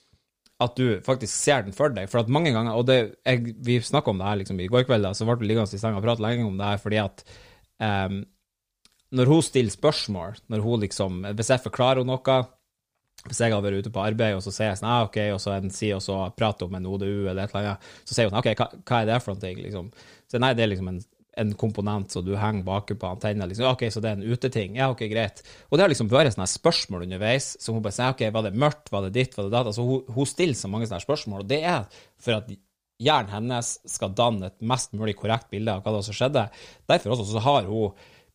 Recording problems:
uneven, jittery; strongly; from 4 to 37 s

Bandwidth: 15 kHz